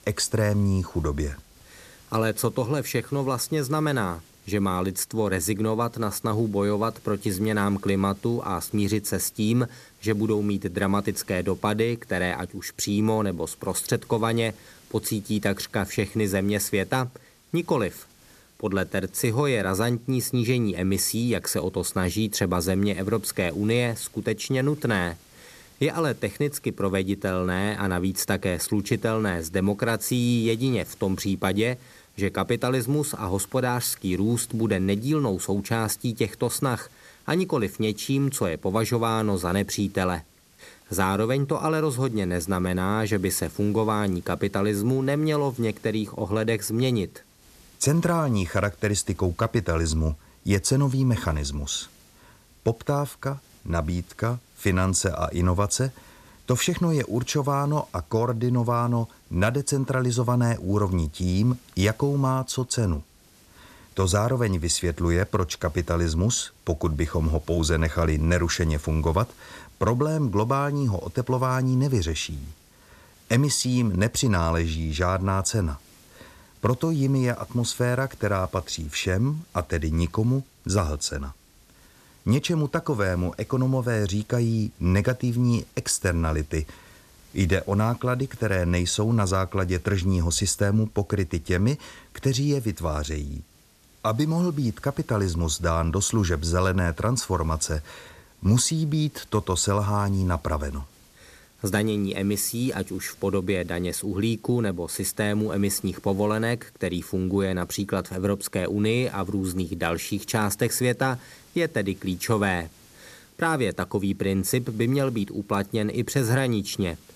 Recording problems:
hiss; faint; throughout; 30 dB below the speech

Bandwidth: 14 kHz